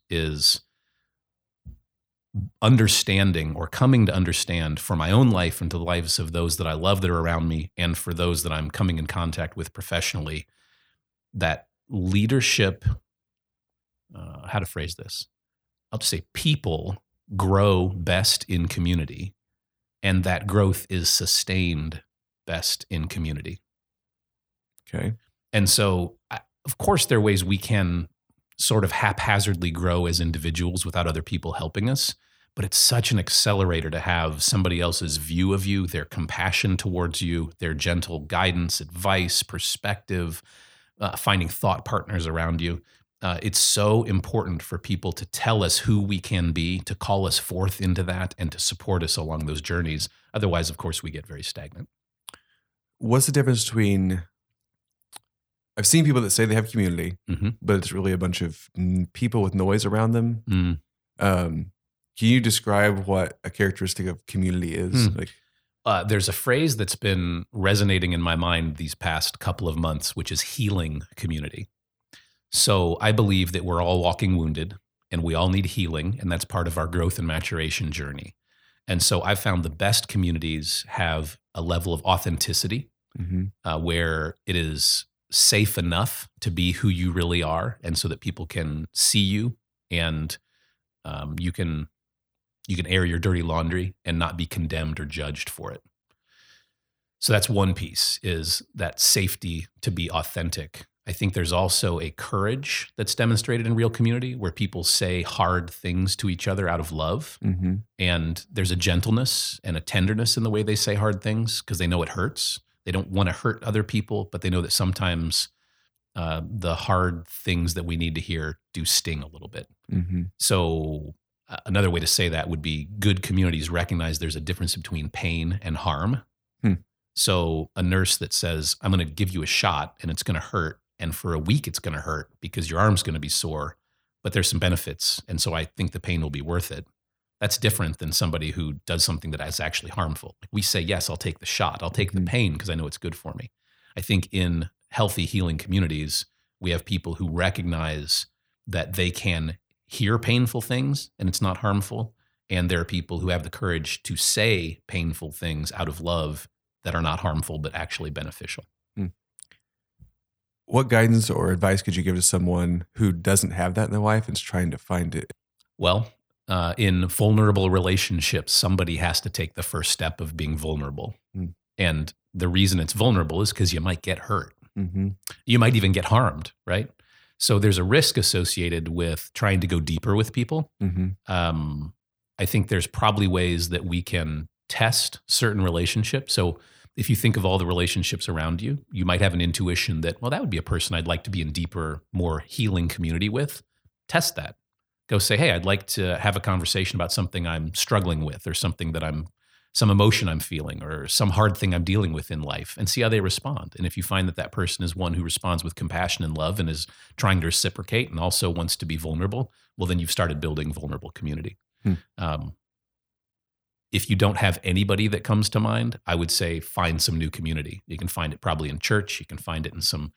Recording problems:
none

